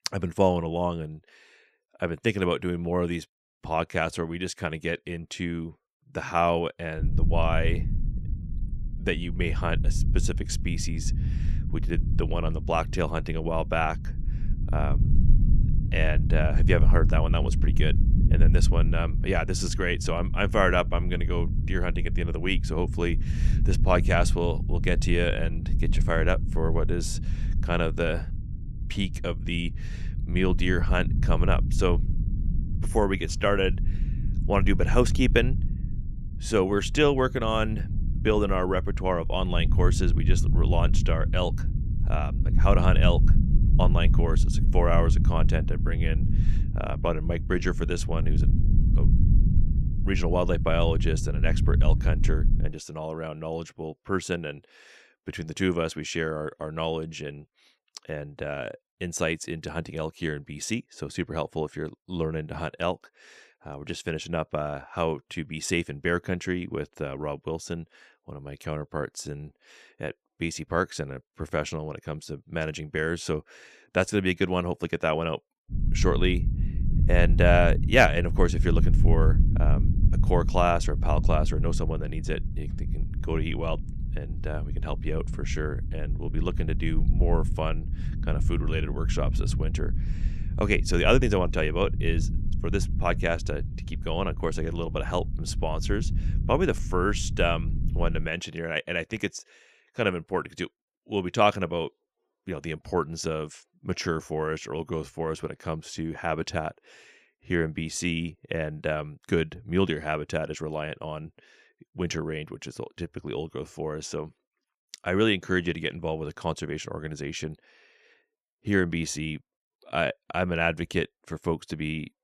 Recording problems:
low rumble; noticeable; from 7 to 53 s and from 1:16 to 1:38; 15 dB below the speech

